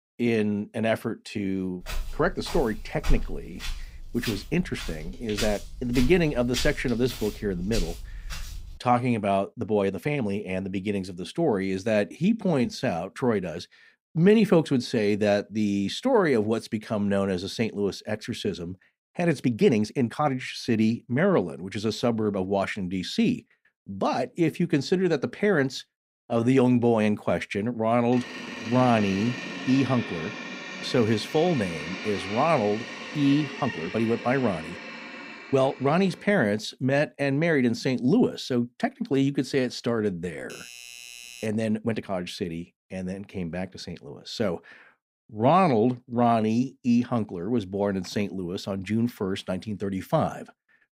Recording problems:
footsteps; noticeable; from 2 to 8.5 s; peak 6 dB below the speech
uneven, jittery; strongly; from 9.5 to 47 s
door banging; noticeable; from 28 to 36 s; peak 8 dB below the speech
doorbell; faint; from 40 to 41 s; peak 15 dB below the speech

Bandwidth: 15.5 kHz